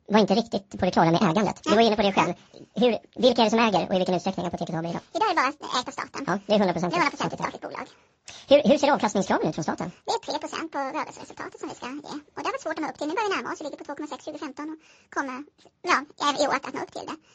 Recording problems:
wrong speed and pitch; too fast and too high; 1.7 times normal speed
garbled, watery; slightly

